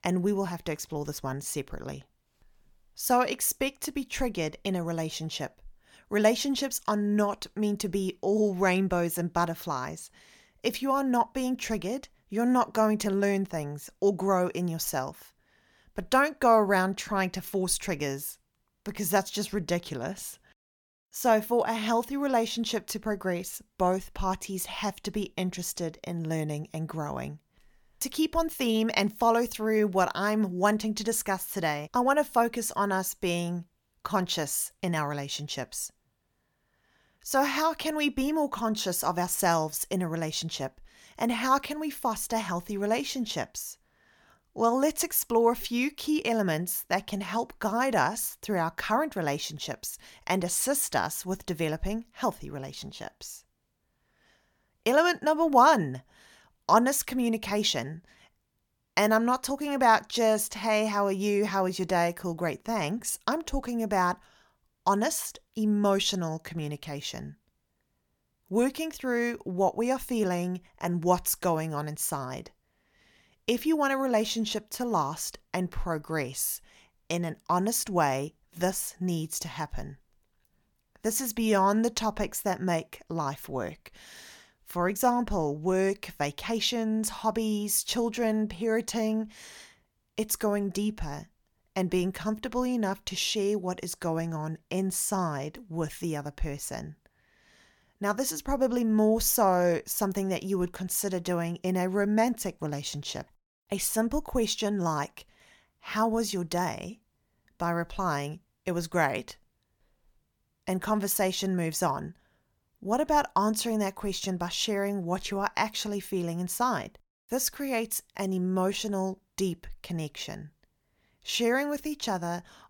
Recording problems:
none

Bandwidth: 18 kHz